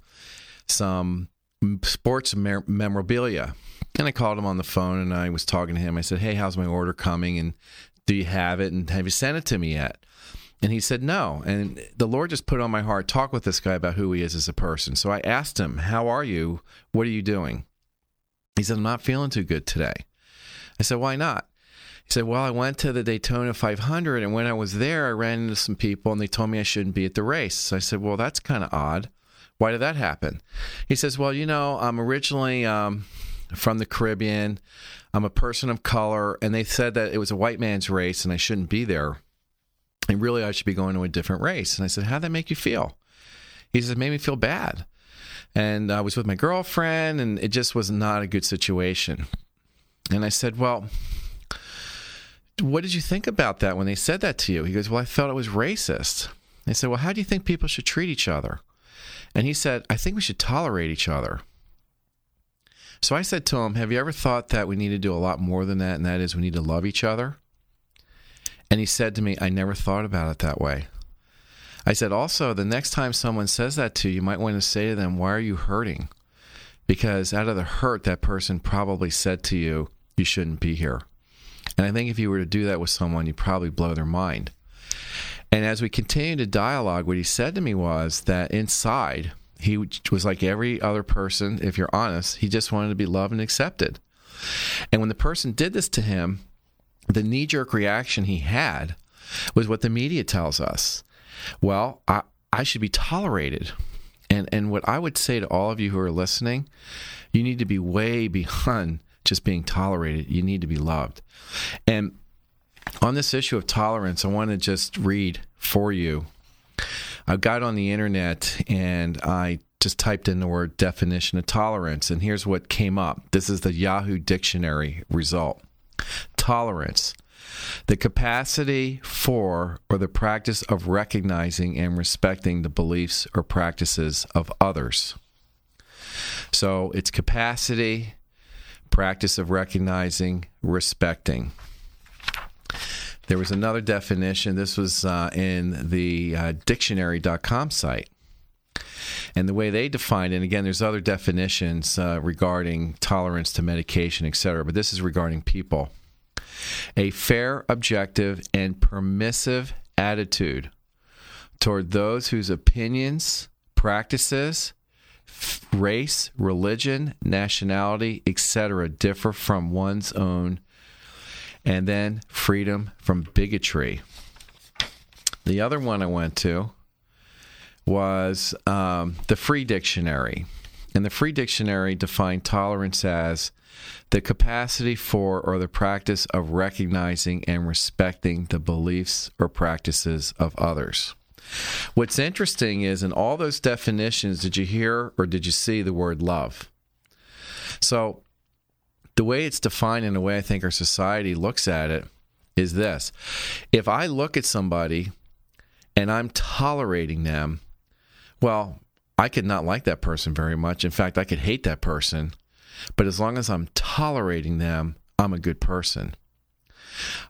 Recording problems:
squashed, flat; somewhat

